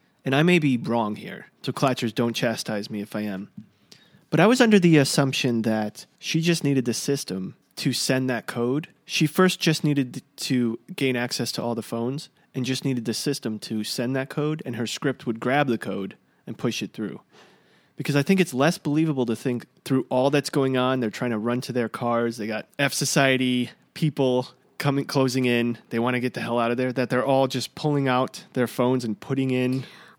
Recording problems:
none

